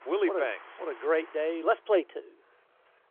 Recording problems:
phone-call audio; nothing above 3.5 kHz
traffic noise; faint; throughout; 20 dB below the speech

